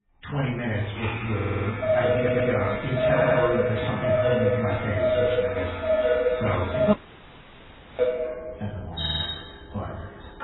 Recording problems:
off-mic speech; far
garbled, watery; badly; nothing above 4 kHz
room echo; slight; dies away in 0.5 s
household noises; very loud; throughout; 3 dB above the speech
audio stuttering; 4 times, first at 1.5 s
audio cutting out; at 7 s for 1 s

